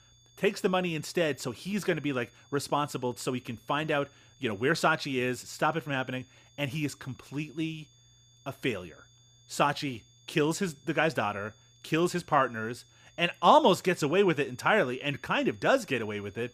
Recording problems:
high-pitched whine; faint; throughout; 3.5 kHz, 30 dB below the speech

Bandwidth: 15 kHz